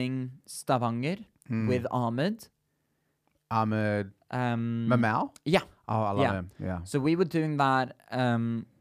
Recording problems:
abrupt cut into speech; at the start

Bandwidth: 15 kHz